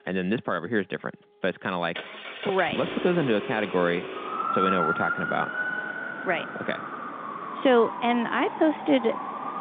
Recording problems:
phone-call audio; nothing above 3.5 kHz
traffic noise; loud; throughout; 5 dB below the speech

